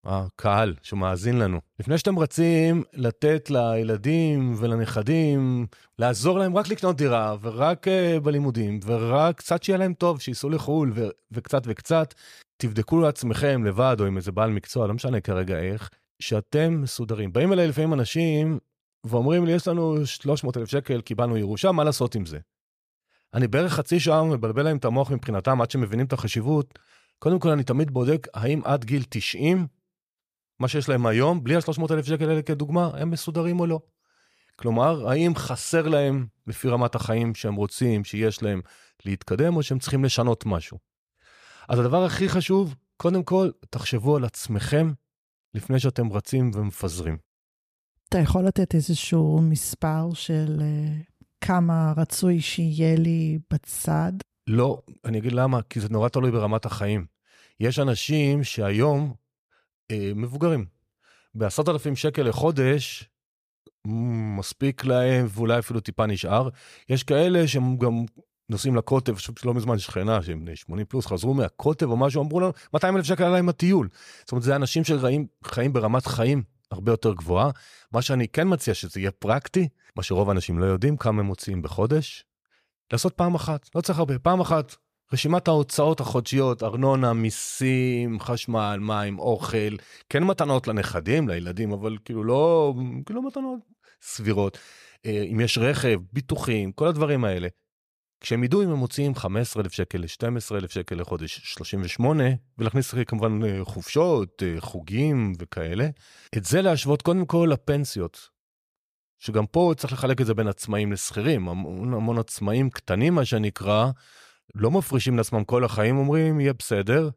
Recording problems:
none

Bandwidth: 15 kHz